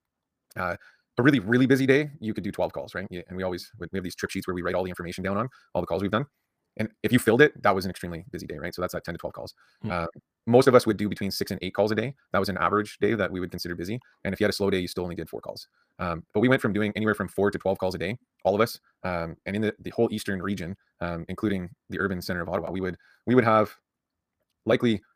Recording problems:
wrong speed, natural pitch; too fast; 1.8 times normal speed

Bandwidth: 15 kHz